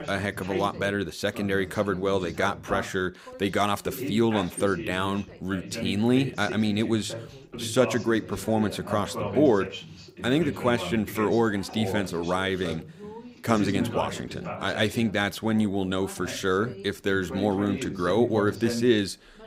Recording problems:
background chatter; loud; throughout; 2 voices, 10 dB below the speech

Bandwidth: 15.5 kHz